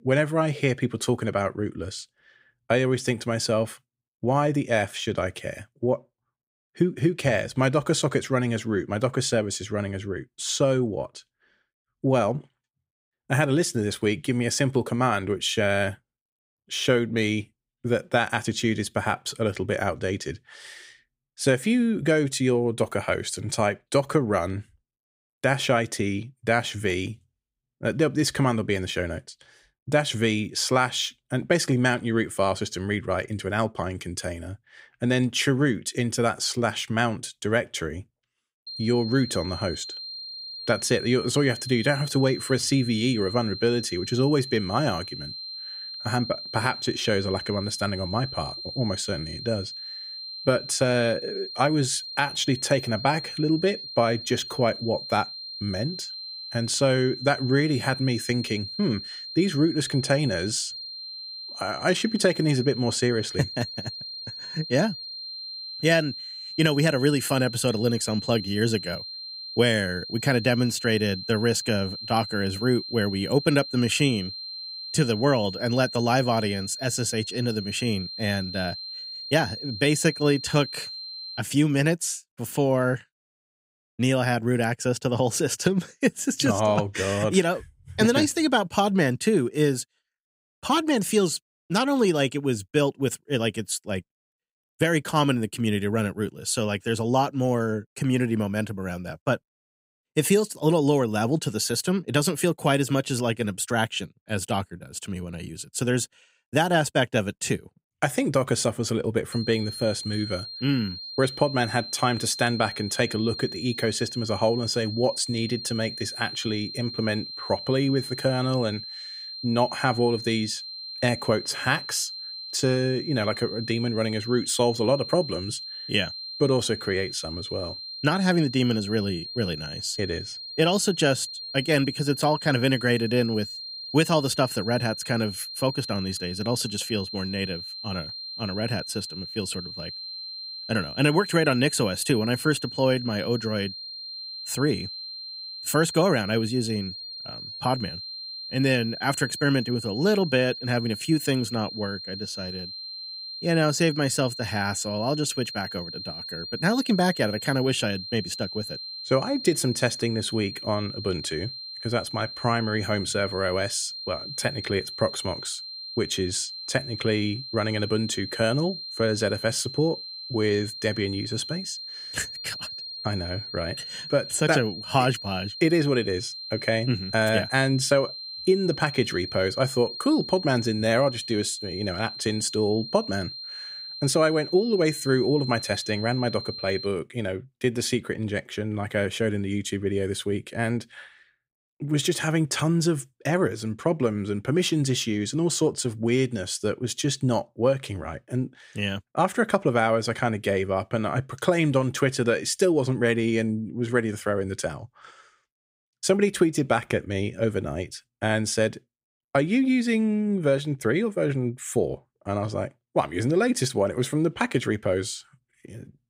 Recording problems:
high-pitched whine; loud; from 39 s to 1:21 and from 1:49 to 3:07; 4 kHz, 9 dB below the speech

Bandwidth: 15.5 kHz